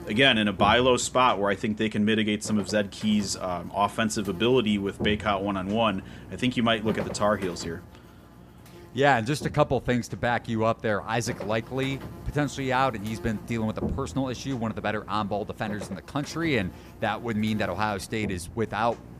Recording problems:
electrical hum; noticeable; throughout; 60 Hz, 20 dB below the speech

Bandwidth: 15 kHz